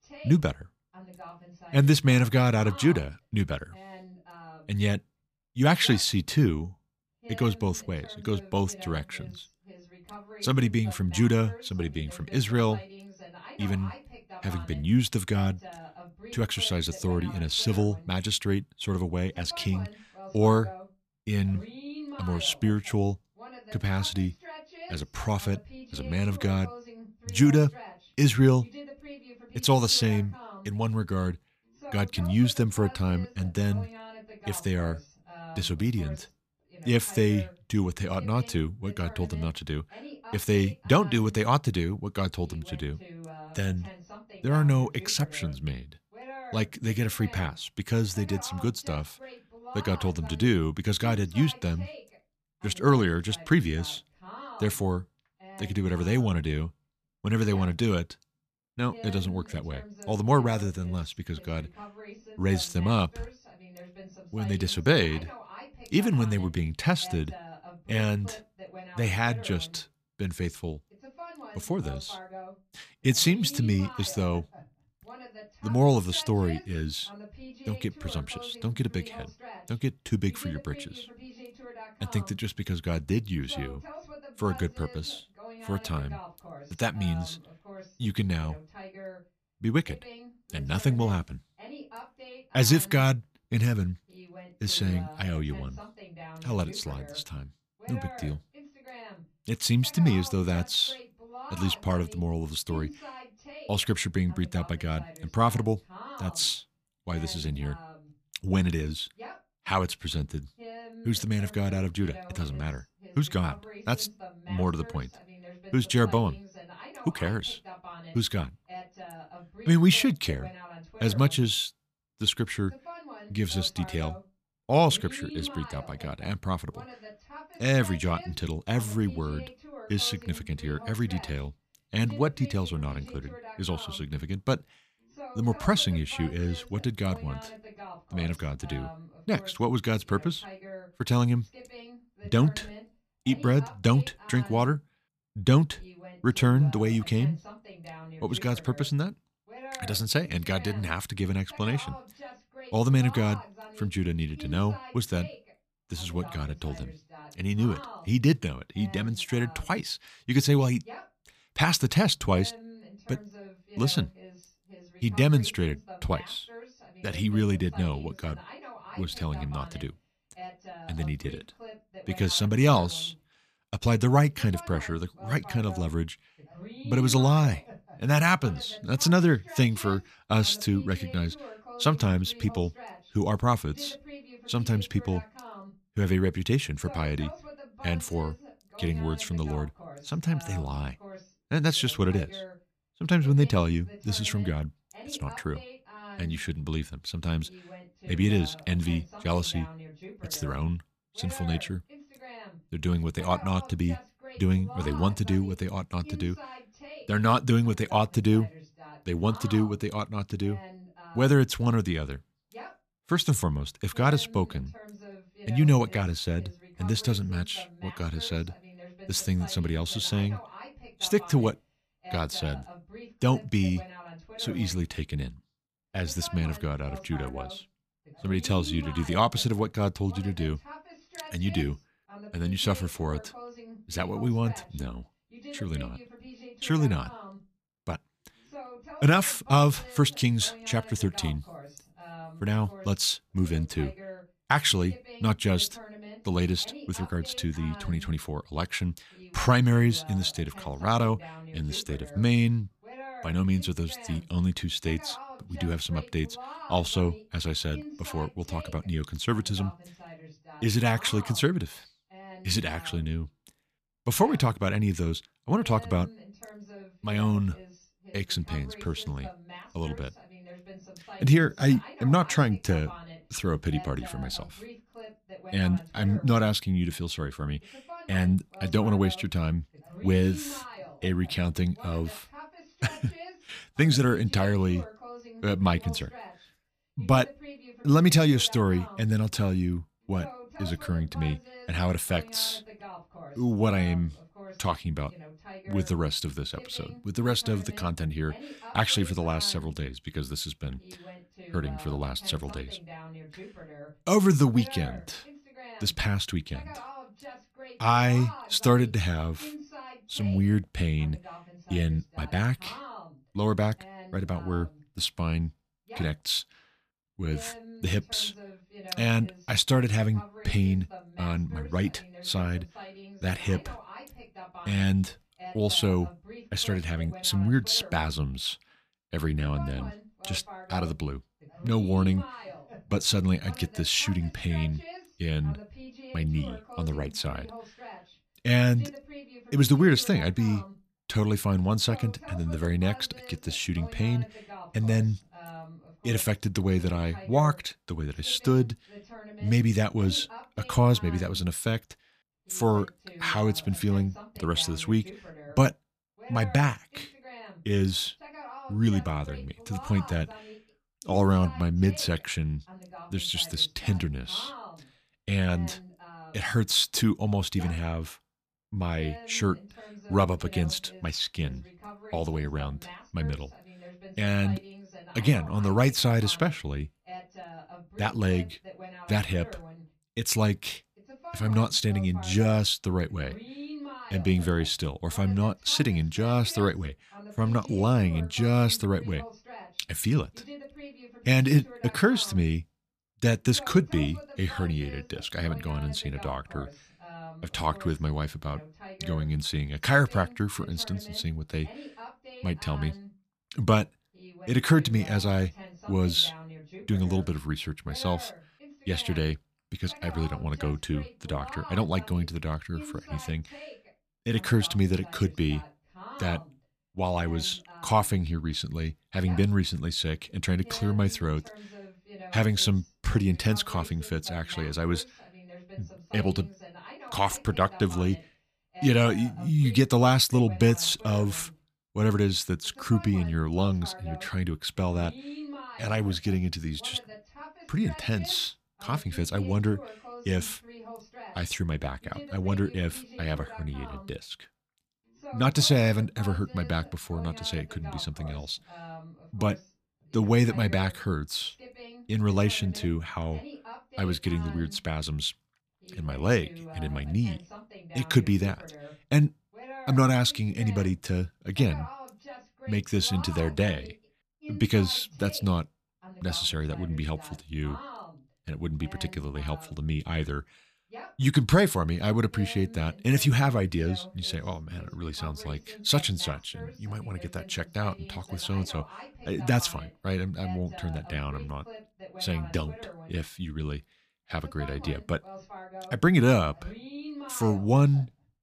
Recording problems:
voice in the background; noticeable; throughout; 20 dB below the speech

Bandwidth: 14.5 kHz